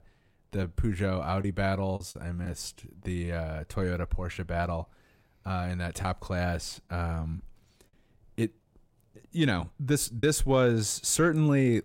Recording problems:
choppy; occasionally; 2% of the speech affected

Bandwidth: 16 kHz